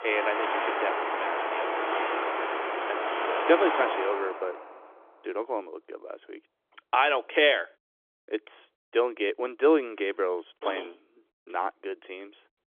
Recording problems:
phone-call audio; nothing above 3.5 kHz
traffic noise; loud; until 4 s; 1 dB below the speech

